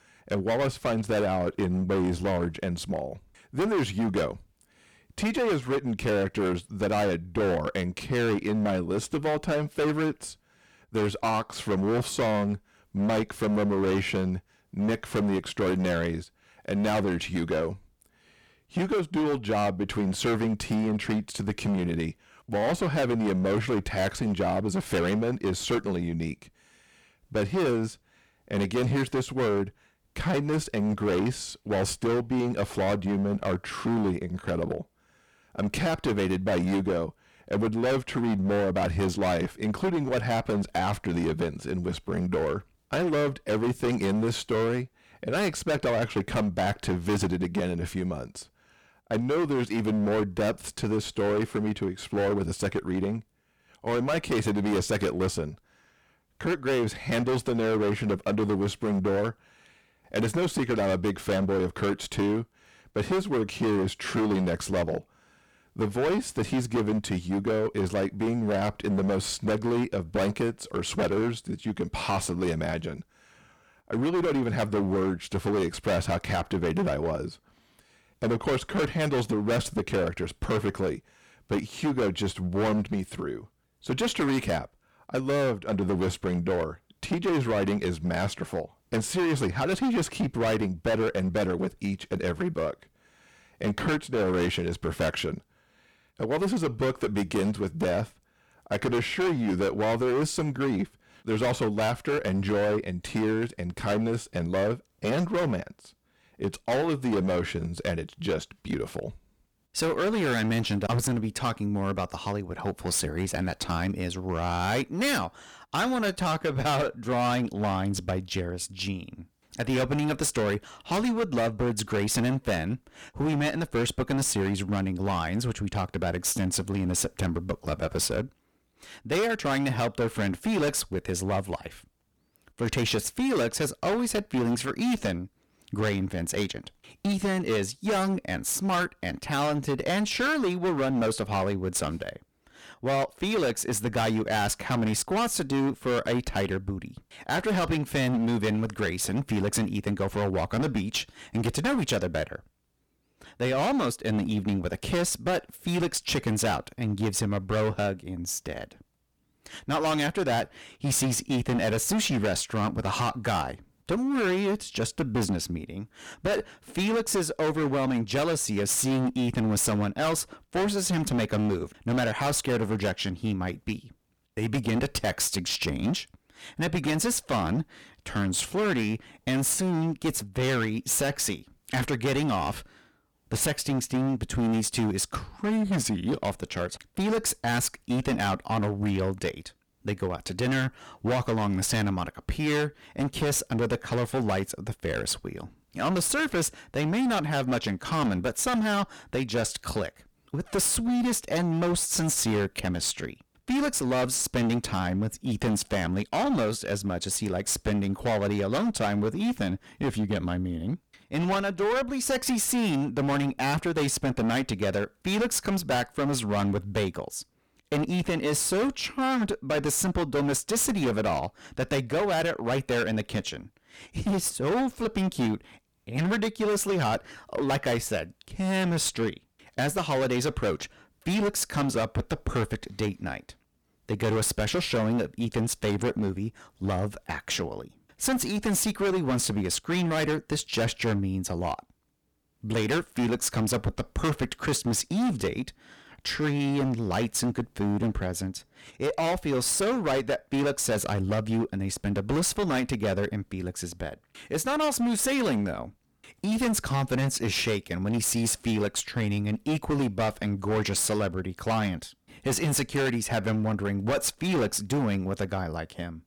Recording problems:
distortion; heavy; 19% of the sound clipped

